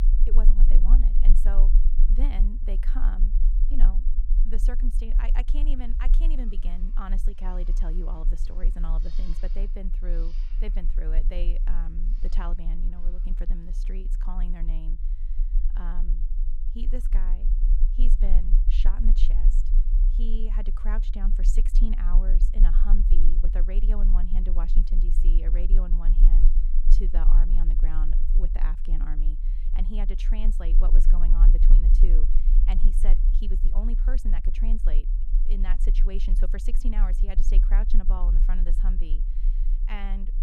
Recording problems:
low rumble; loud; throughout; 8 dB below the speech
animal sounds; noticeable; until 20 s; 20 dB below the speech

